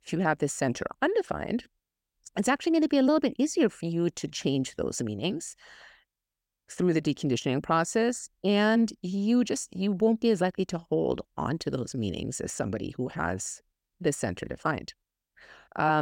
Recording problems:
abrupt cut into speech; at the end

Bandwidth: 16.5 kHz